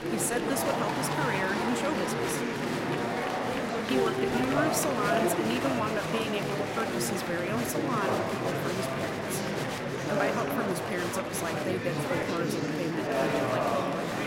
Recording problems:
murmuring crowd; very loud; throughout; 3 dB above the speech

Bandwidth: 16 kHz